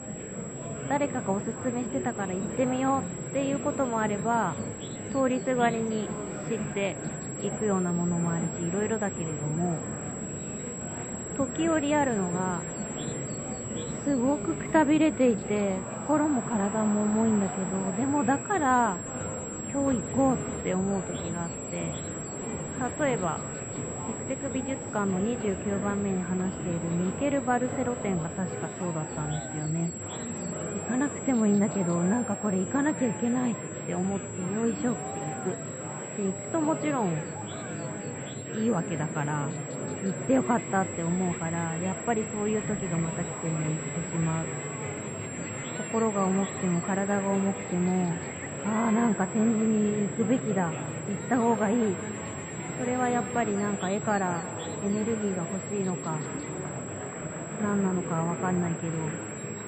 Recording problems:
muffled; very; fading above 2.5 kHz
echo of what is said; noticeable; from 44 s on; 190 ms later, 15 dB below the speech
murmuring crowd; loud; throughout; 7 dB below the speech
electrical hum; noticeable; throughout; 60 Hz, 20 dB below the speech
high-pitched whine; noticeable; throughout; 7.5 kHz, 10 dB below the speech

